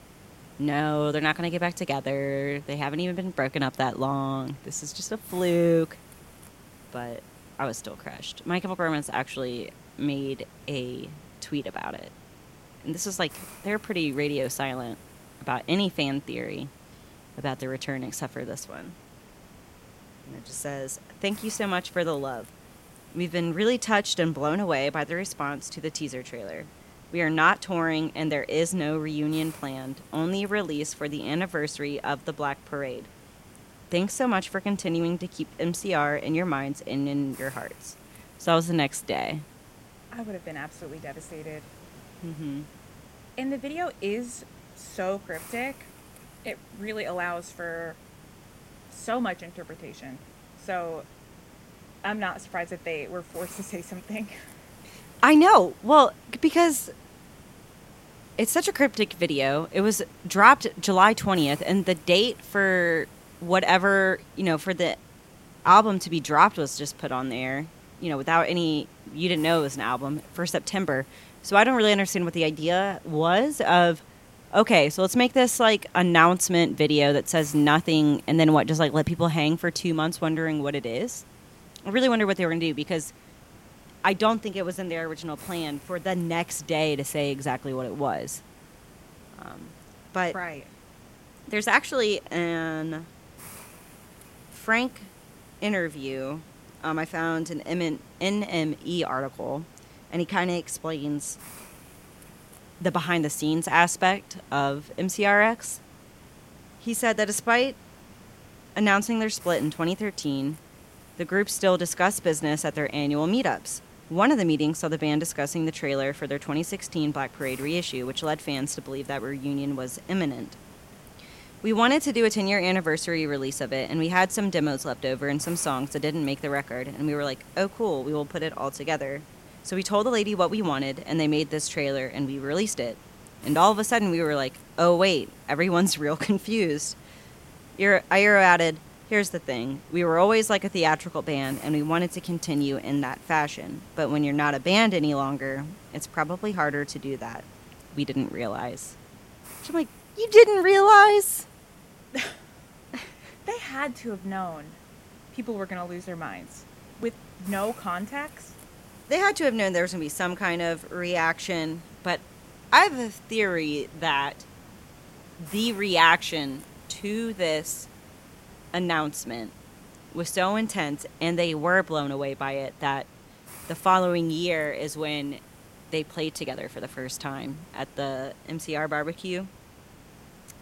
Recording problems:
hiss; faint; throughout; 25 dB below the speech

